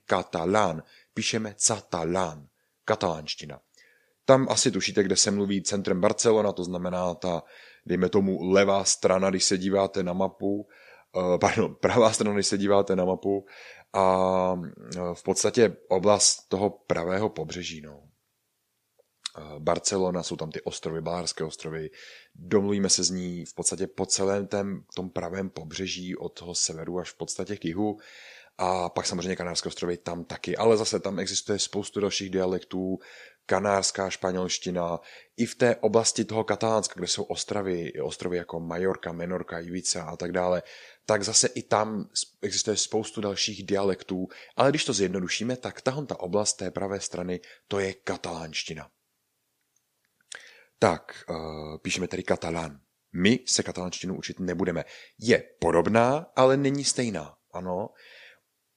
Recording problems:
none

